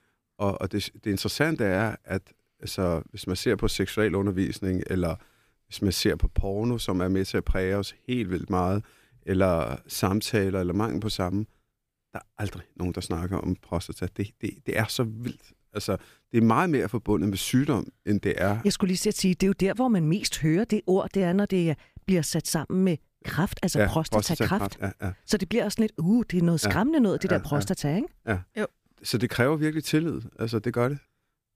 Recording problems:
none

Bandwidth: 15 kHz